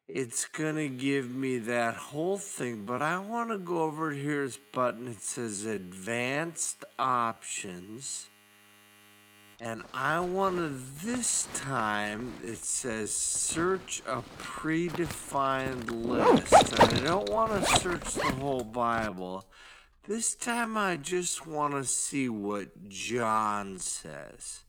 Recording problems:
wrong speed, natural pitch; too slow; 0.5 times normal speed
household noises; very loud; throughout; 4 dB above the speech

